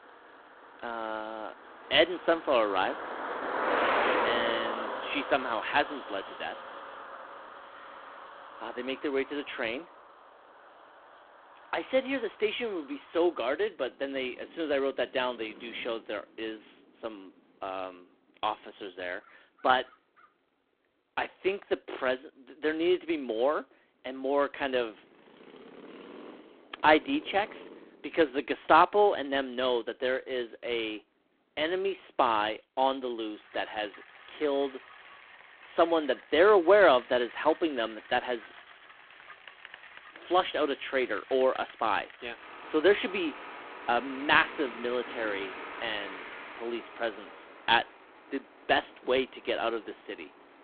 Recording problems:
phone-call audio; poor line
traffic noise; loud; throughout; 10 dB below the speech

